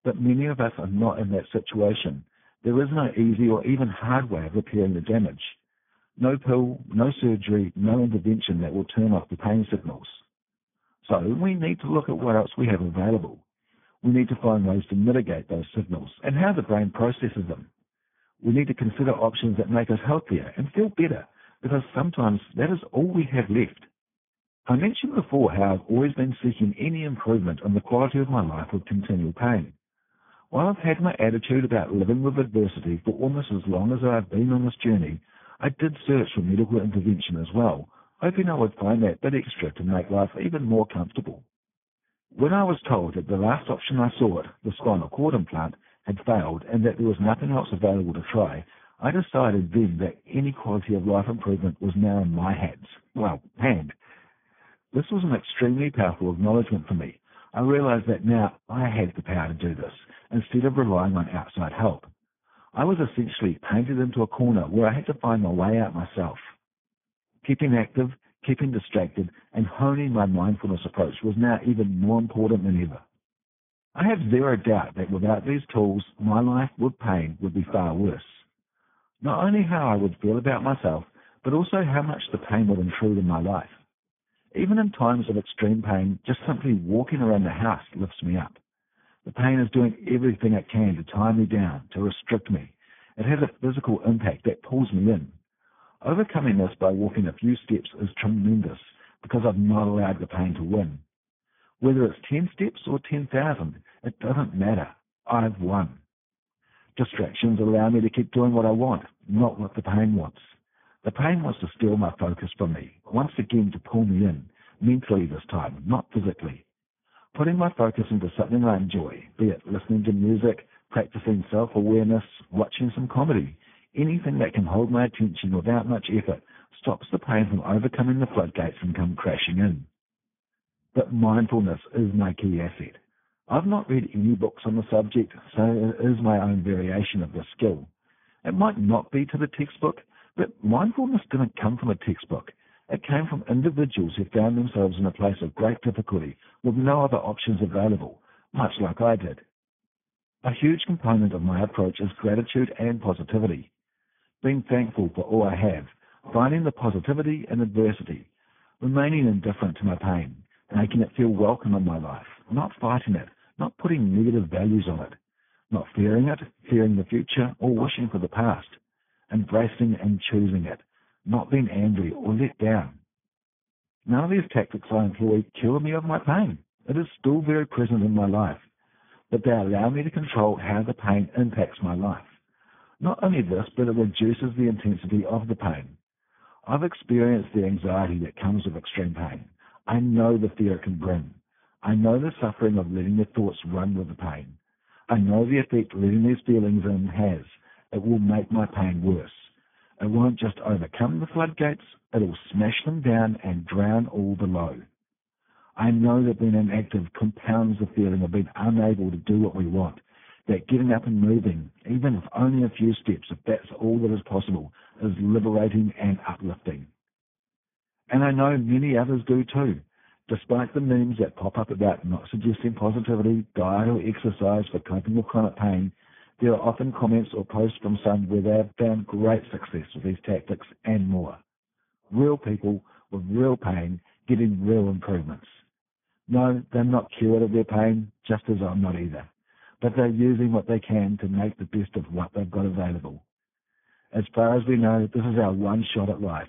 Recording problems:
garbled, watery; badly
high frequencies cut off; severe; nothing above 3.5 kHz

